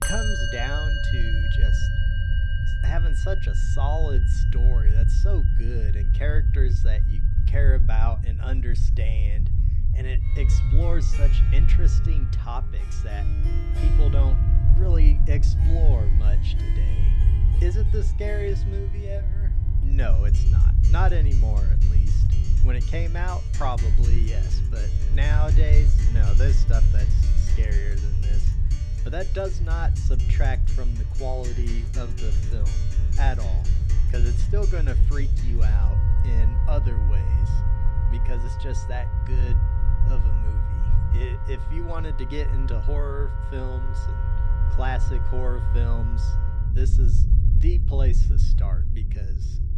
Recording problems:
background music; loud; throughout; 6 dB below the speech
low rumble; loud; throughout; 6 dB below the speech

